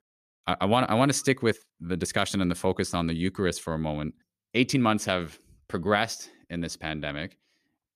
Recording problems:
none

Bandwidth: 14.5 kHz